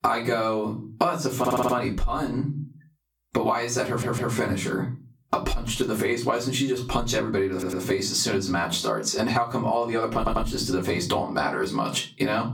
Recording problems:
off-mic speech; far
squashed, flat; heavily
room echo; very slight; dies away in 0.3 s
audio stuttering; 4 times, first at 1.5 s

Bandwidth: 17 kHz